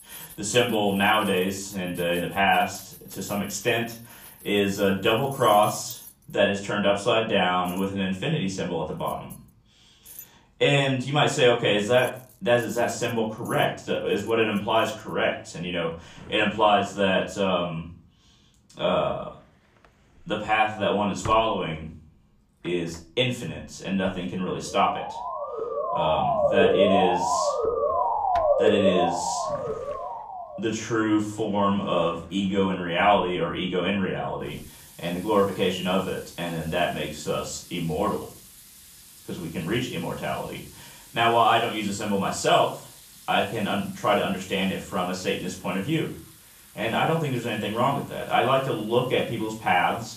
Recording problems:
off-mic speech; far
room echo; slight; dies away in 0.4 s
household noises; faint; throughout; 20 dB below the speech
siren; loud; from 25 to 31 s; peak 5 dB above the speech

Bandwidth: 14.5 kHz